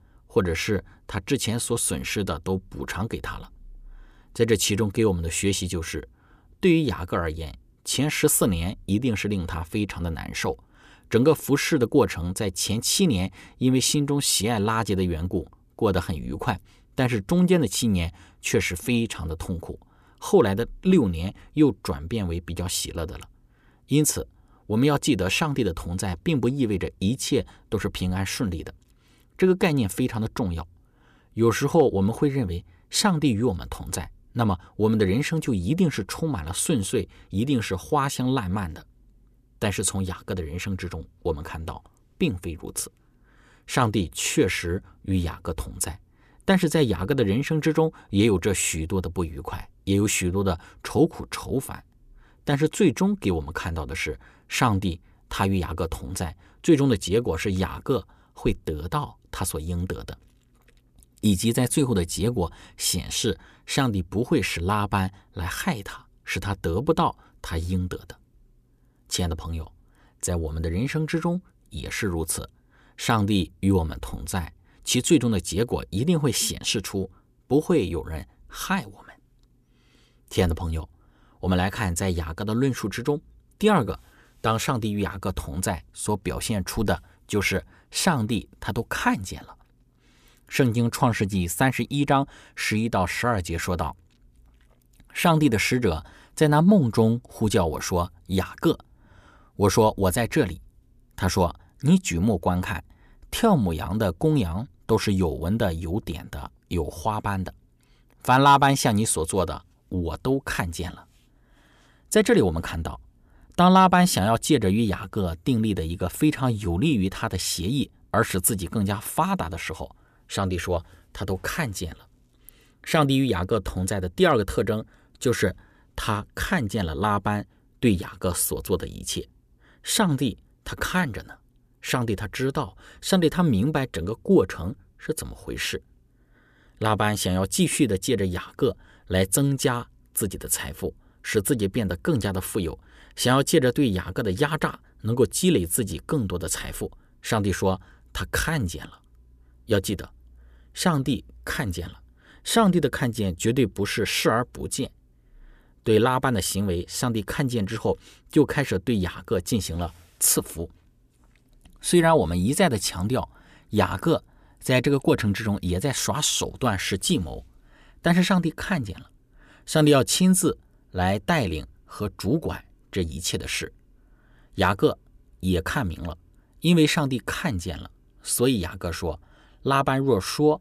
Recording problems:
none

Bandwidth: 14.5 kHz